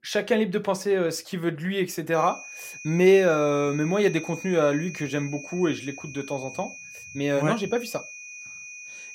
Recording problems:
high-pitched whine; noticeable; from 2 s on; 2.5 kHz, 15 dB below the speech

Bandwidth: 16 kHz